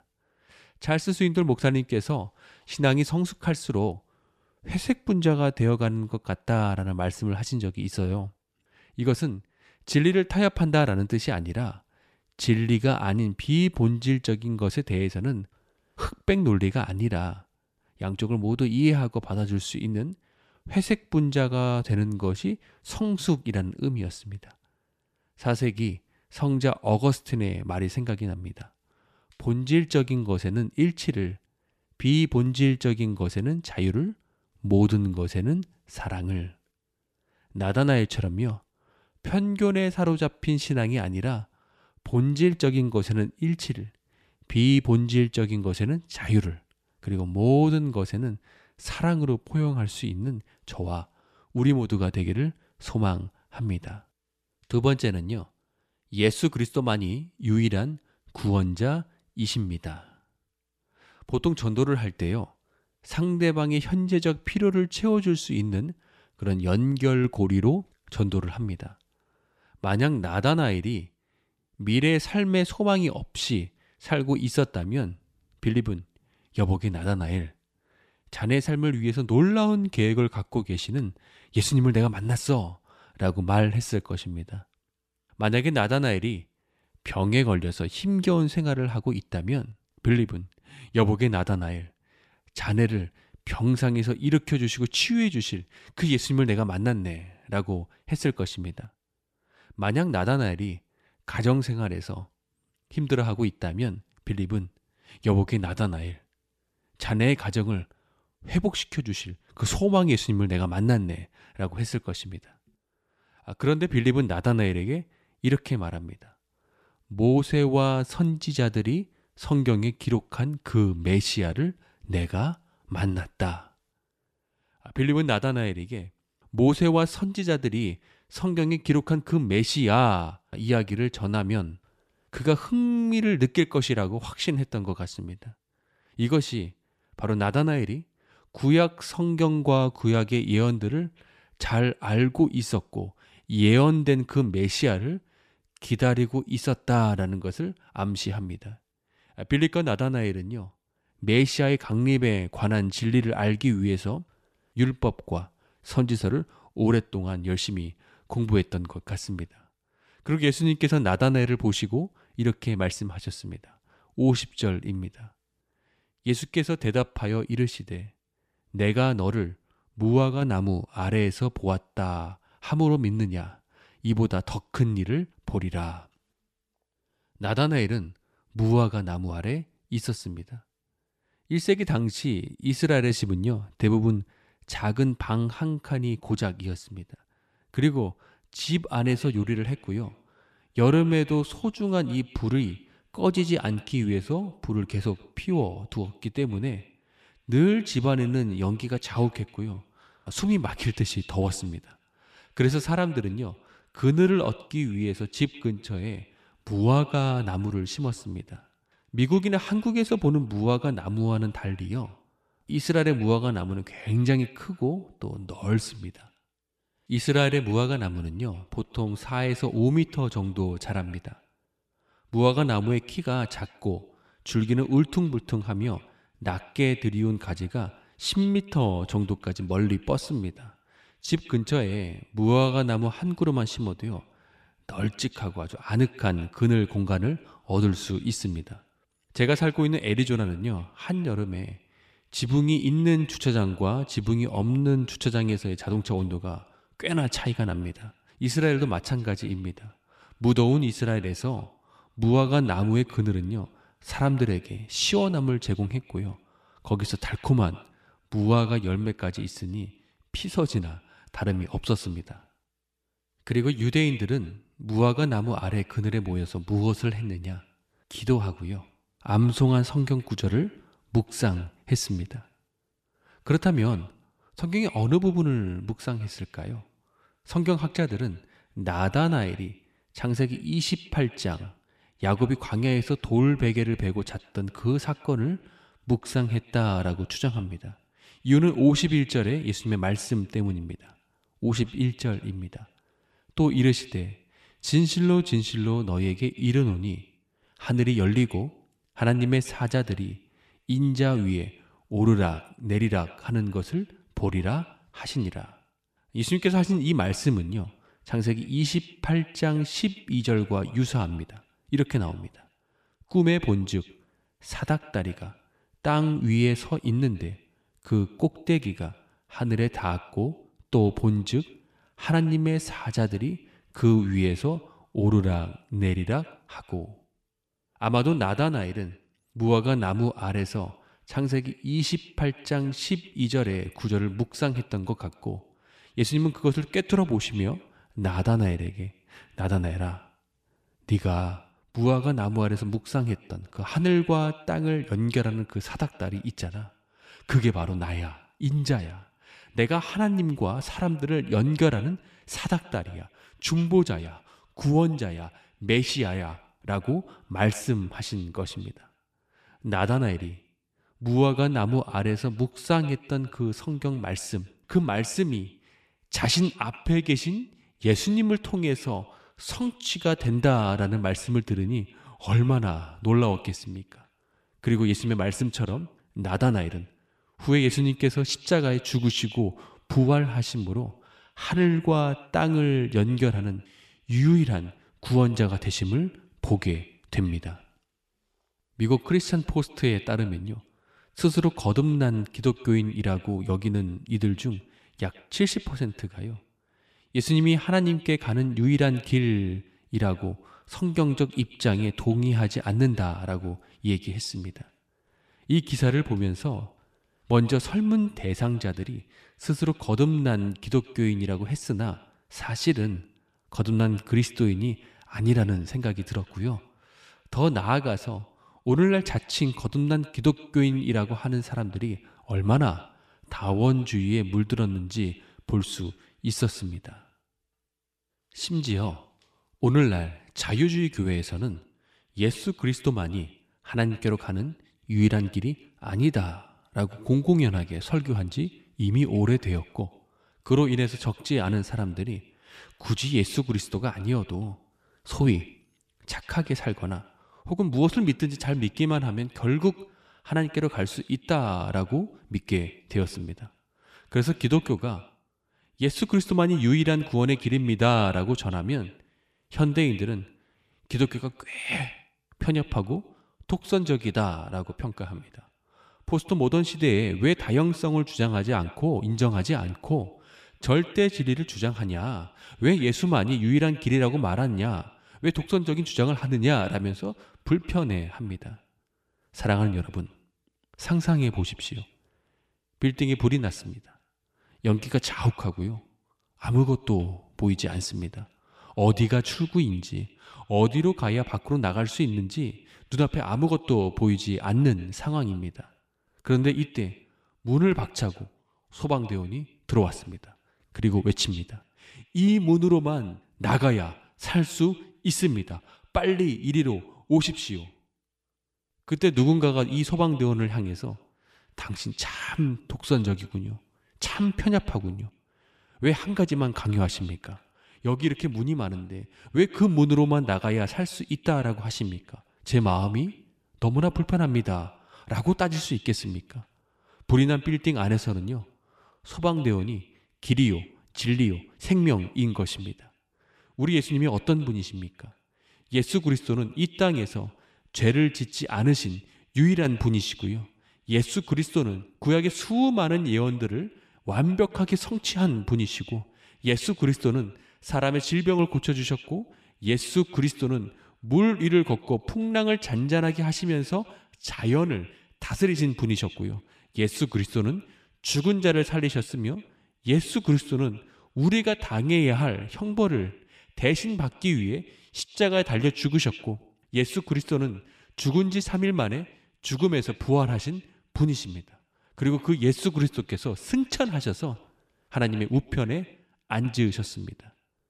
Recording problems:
echo of what is said; faint; from 3:09 on; 120 ms later, 25 dB below the speech

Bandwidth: 14.5 kHz